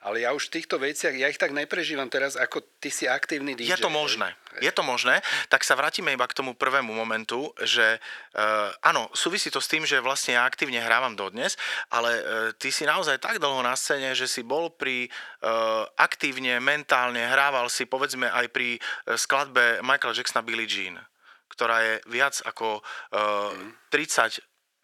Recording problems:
thin; very; fading below 550 Hz

